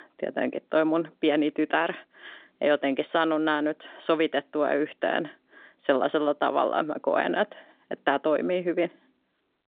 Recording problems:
phone-call audio

